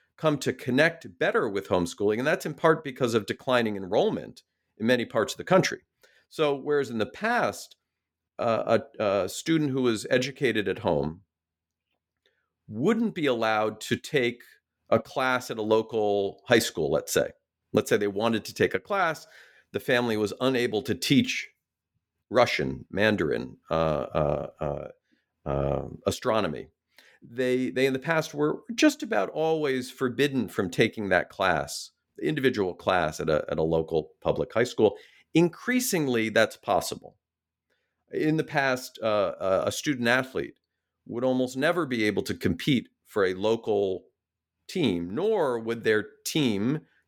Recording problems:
none

